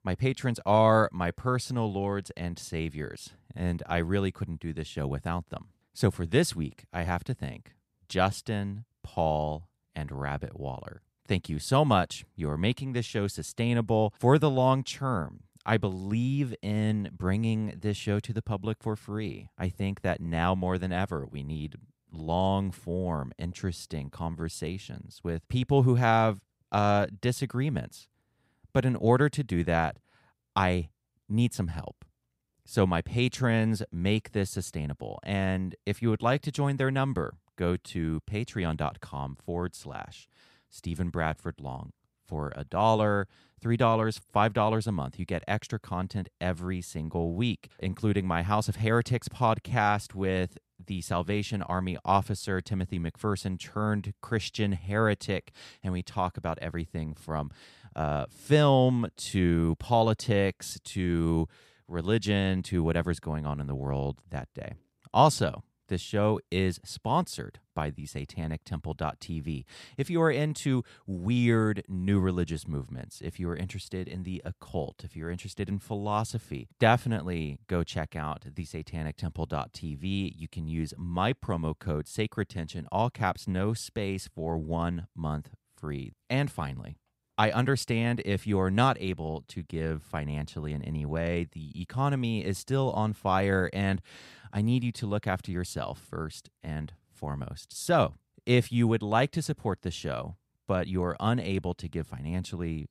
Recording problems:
none

